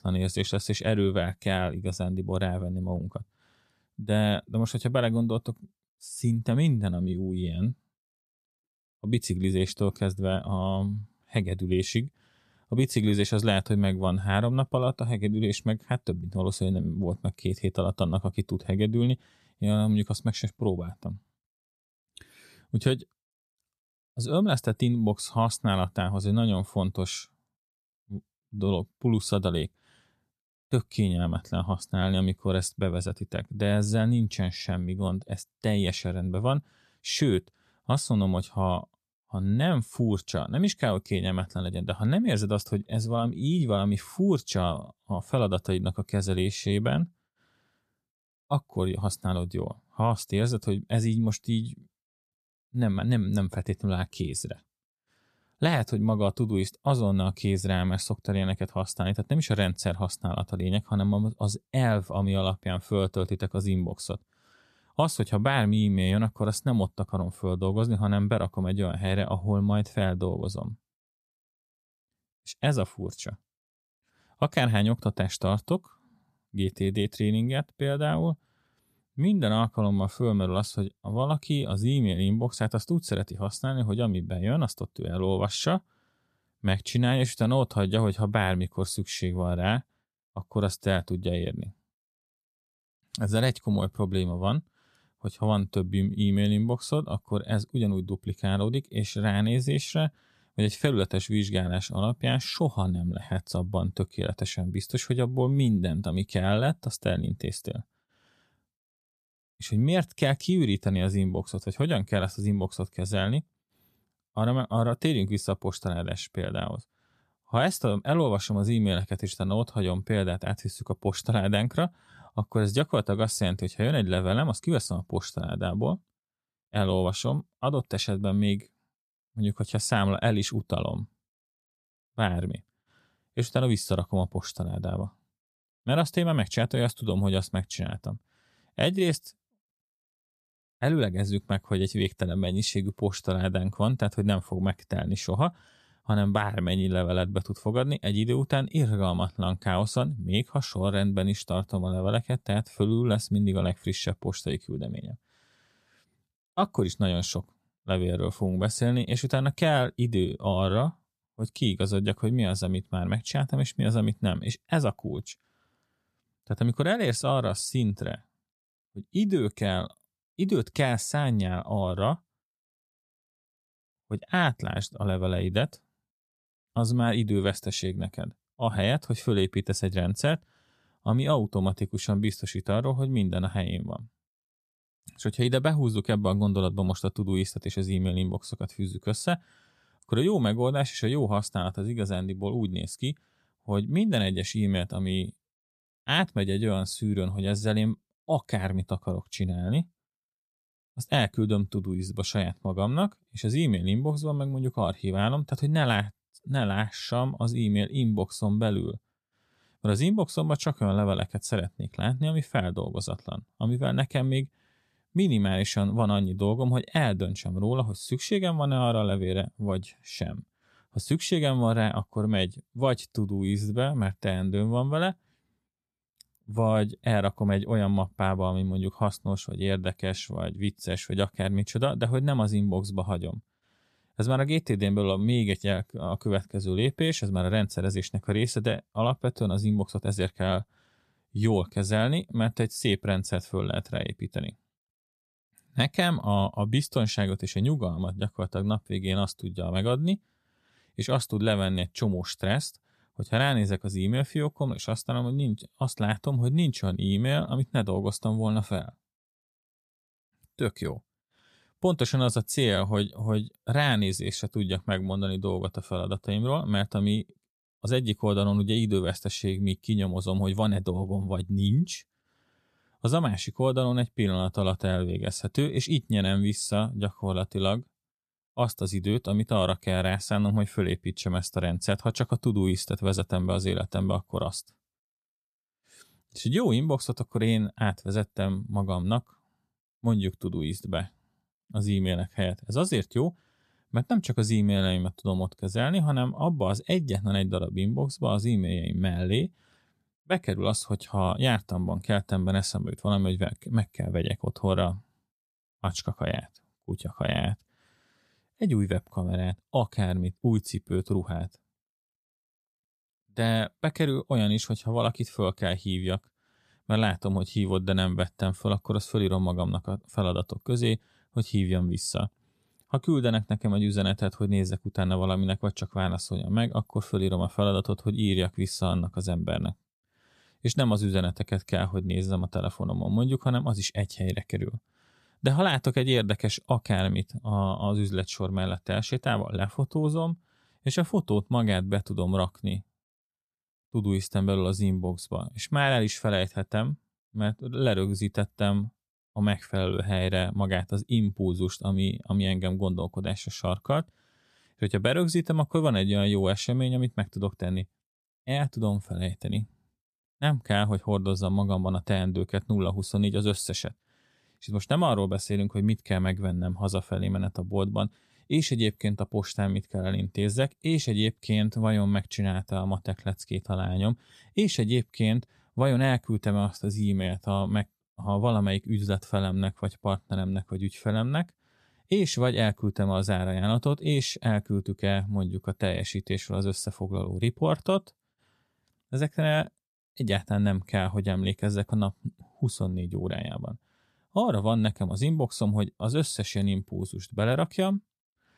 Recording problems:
none

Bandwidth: 14.5 kHz